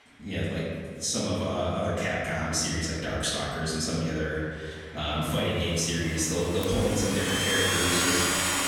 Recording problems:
room echo; strong; dies away in 1.8 s
off-mic speech; far
household noises; very loud; throughout; 1 dB above the speech

